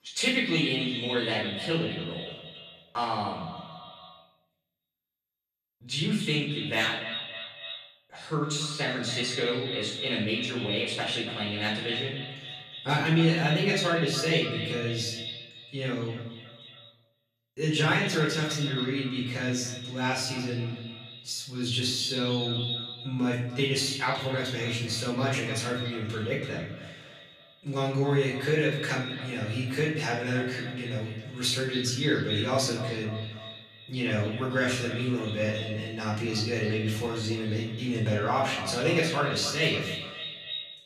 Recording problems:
echo of what is said; strong; throughout; 280 ms later, 9 dB below the speech
off-mic speech; far
room echo; noticeable; dies away in 0.7 s

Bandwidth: 14.5 kHz